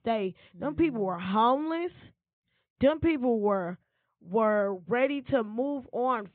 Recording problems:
high frequencies cut off; severe; nothing above 4 kHz

